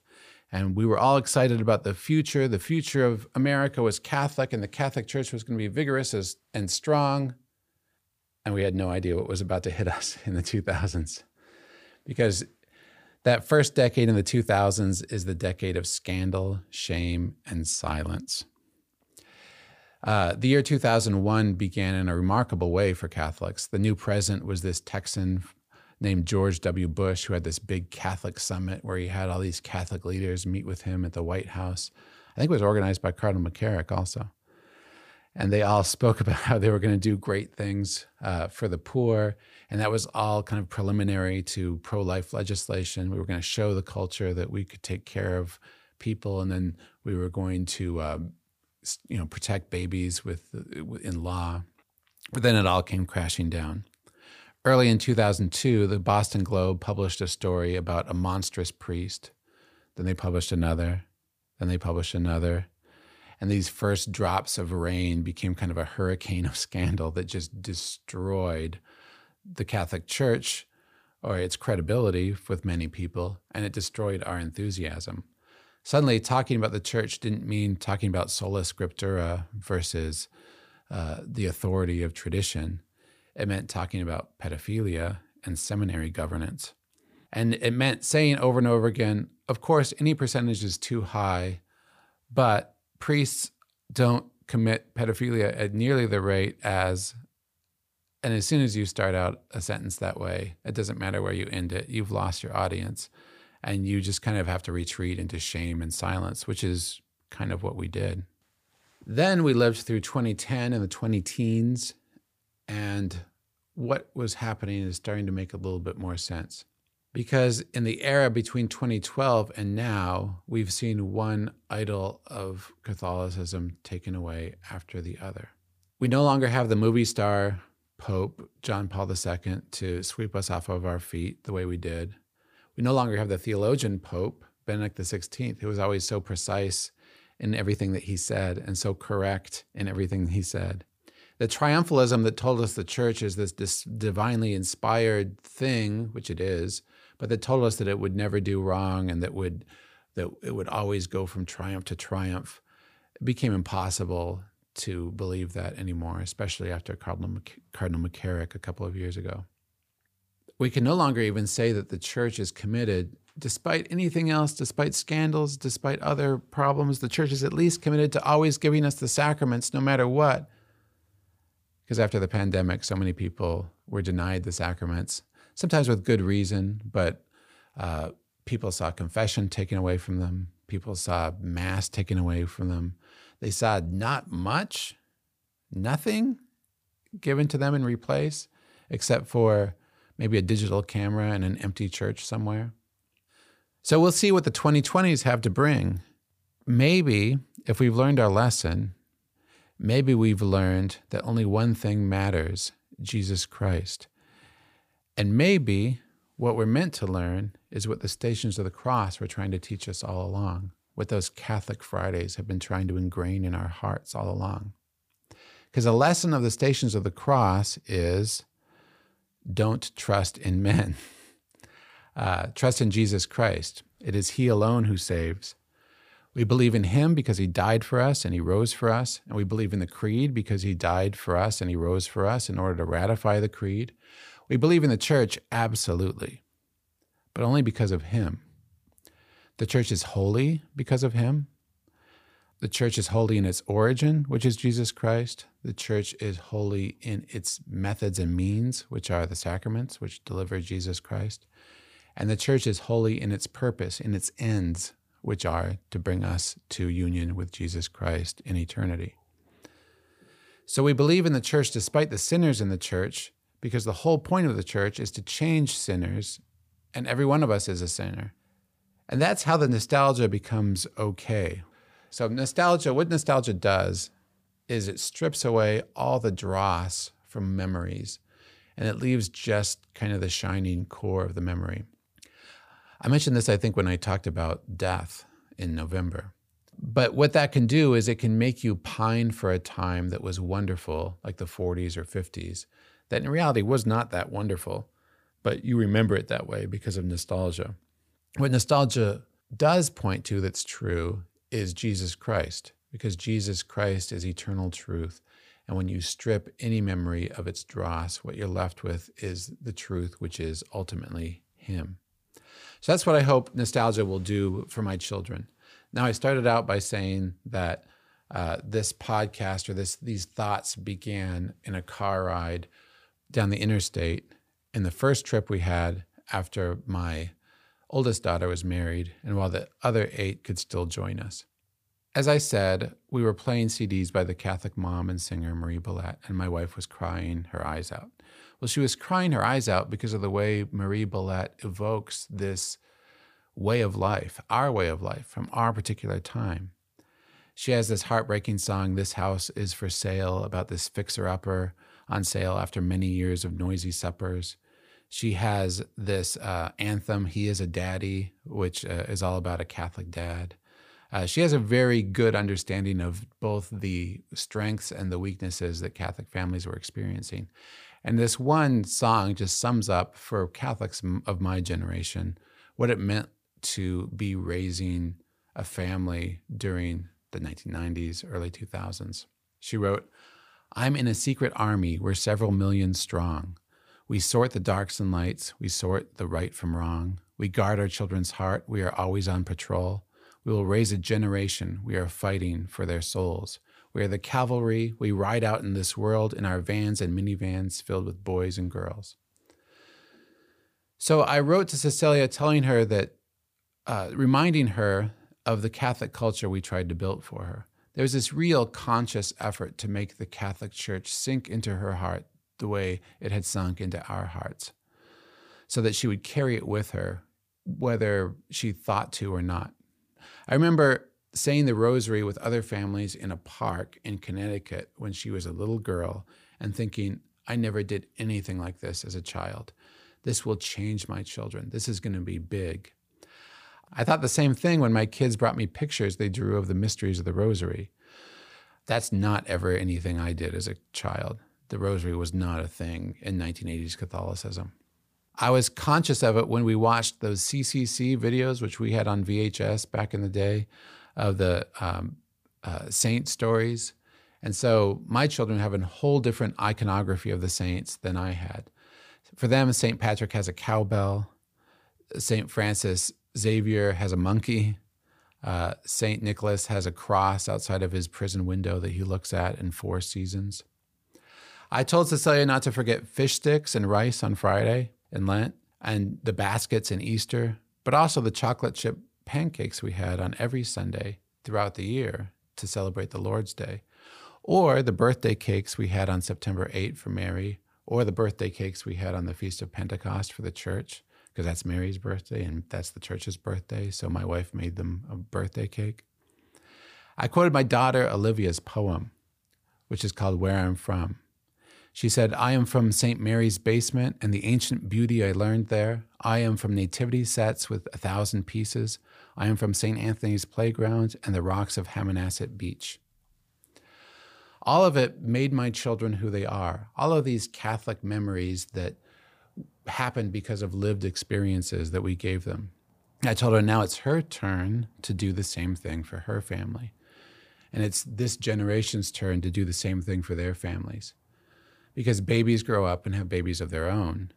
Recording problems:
none

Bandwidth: 15 kHz